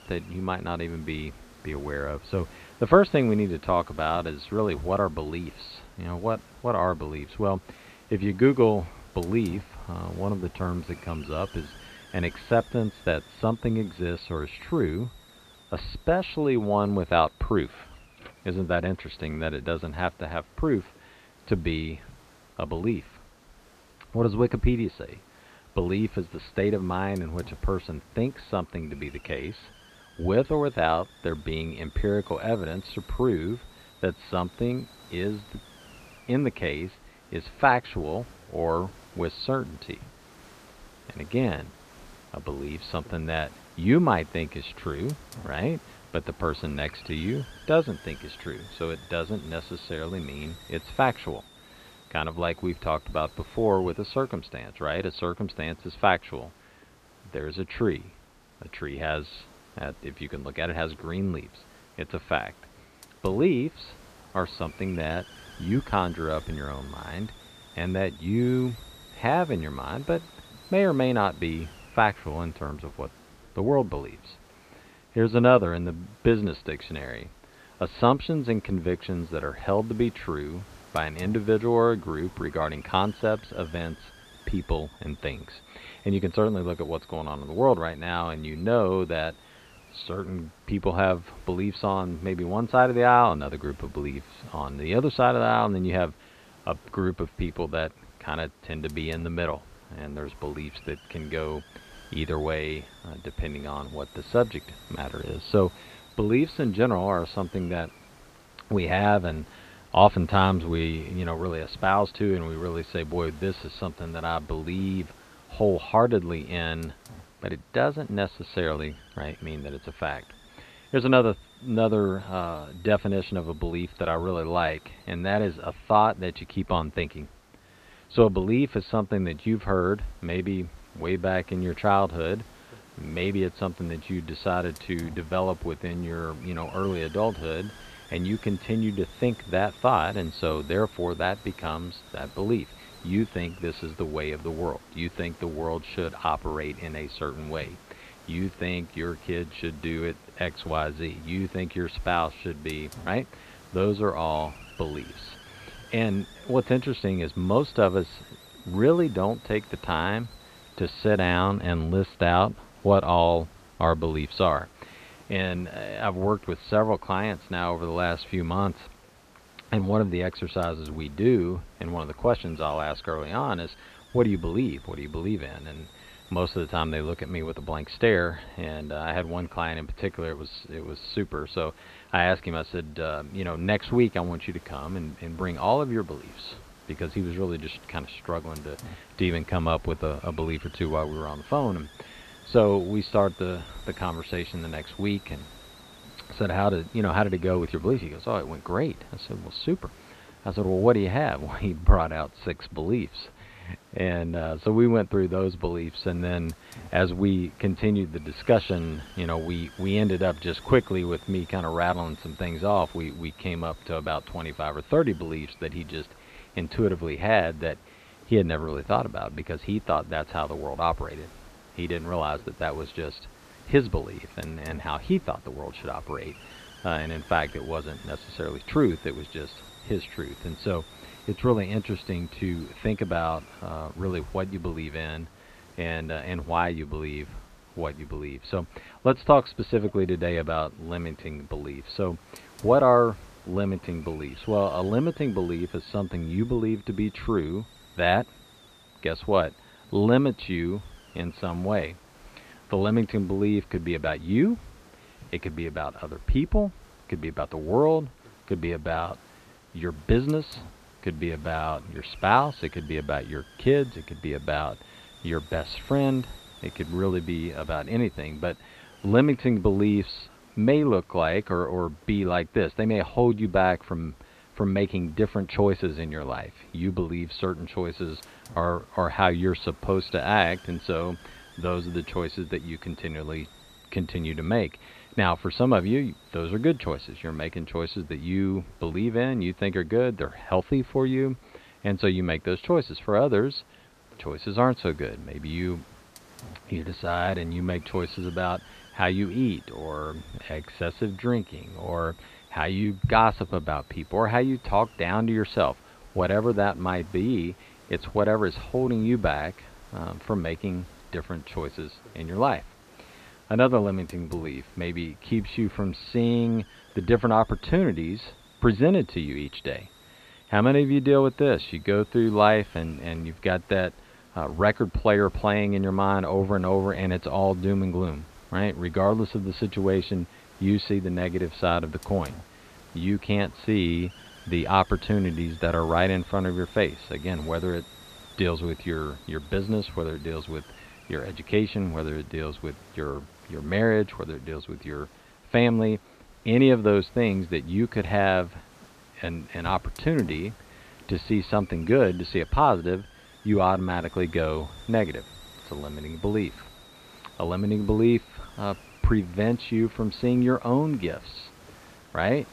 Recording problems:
high frequencies cut off; severe; nothing above 4.5 kHz
hiss; faint; throughout; 25 dB below the speech

